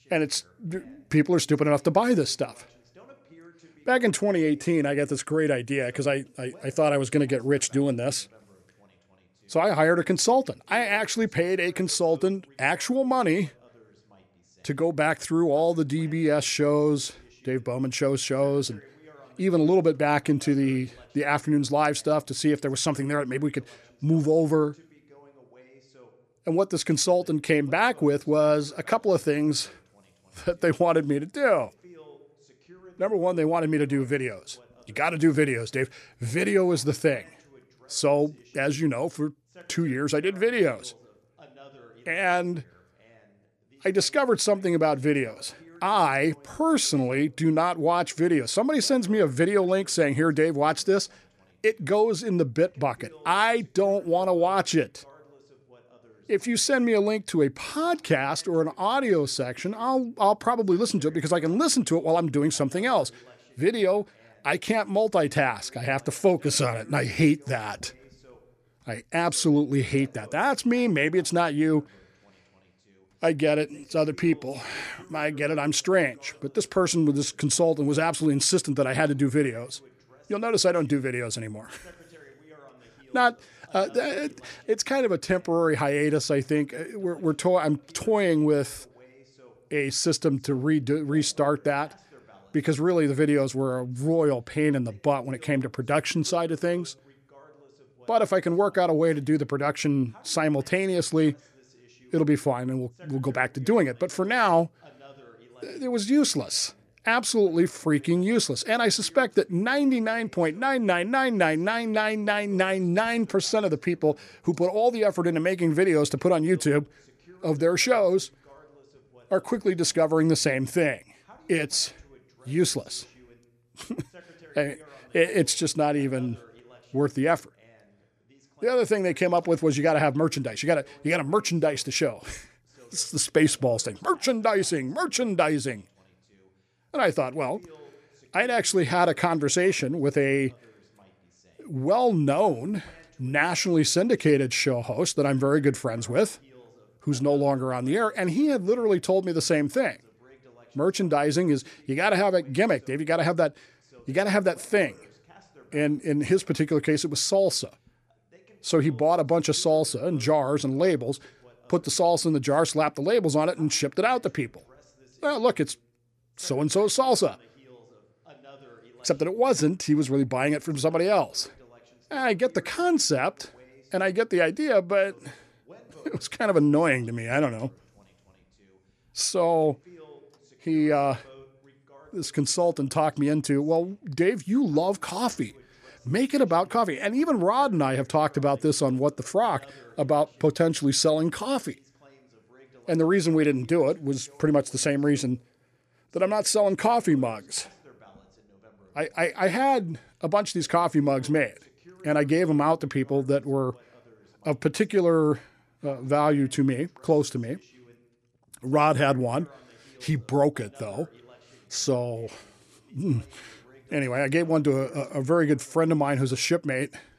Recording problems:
voice in the background; faint; throughout; 30 dB below the speech

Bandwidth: 14.5 kHz